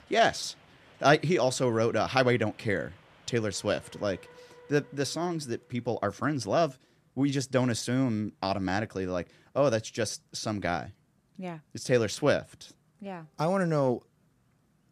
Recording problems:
train or aircraft noise; faint; throughout; 25 dB below the speech

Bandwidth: 14.5 kHz